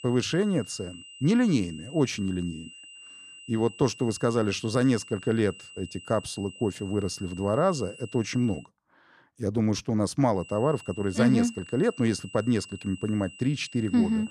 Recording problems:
high-pitched whine; noticeable; until 8.5 s and from 10 s on; 3 kHz, 20 dB below the speech

